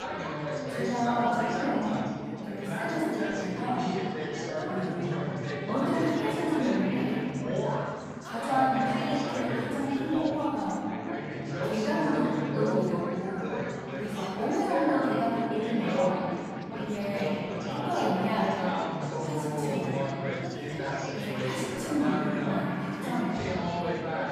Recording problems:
room echo; strong; dies away in 2.3 s
off-mic speech; far
chatter from many people; loud; throughout; 2 dB below the speech

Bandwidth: 14.5 kHz